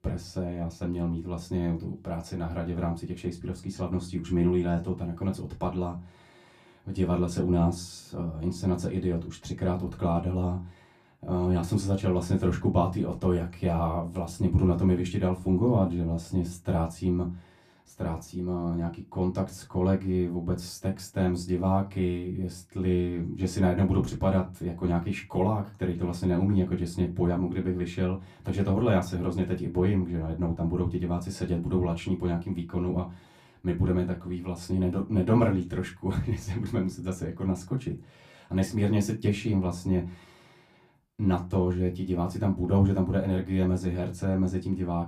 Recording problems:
off-mic speech; far
room echo; very slight; dies away in 0.2 s

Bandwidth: 15 kHz